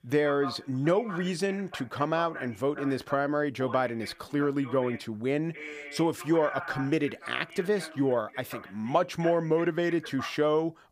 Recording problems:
voice in the background; noticeable; throughout; 15 dB below the speech

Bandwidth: 15 kHz